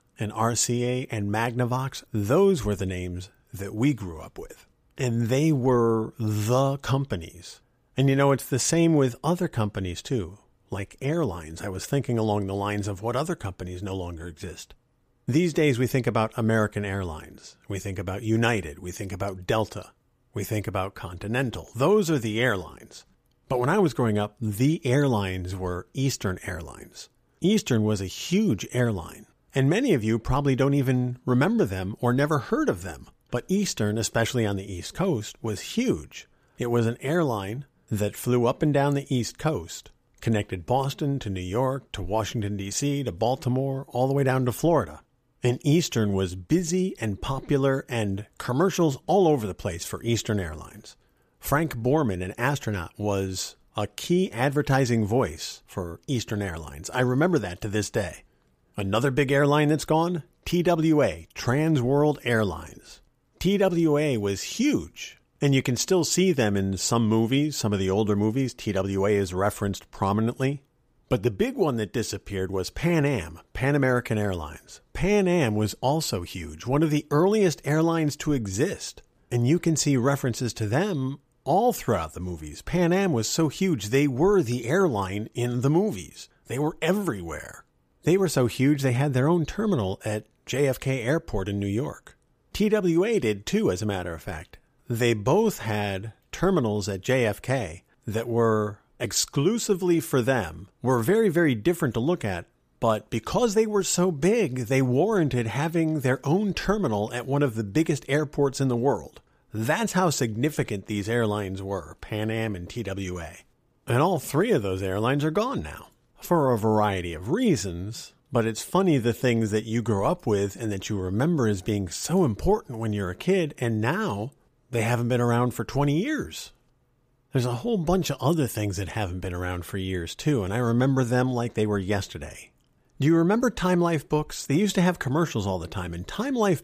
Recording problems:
none

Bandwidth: 15 kHz